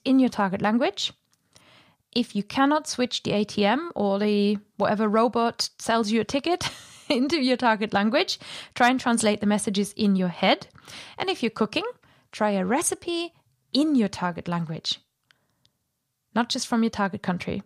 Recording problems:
none

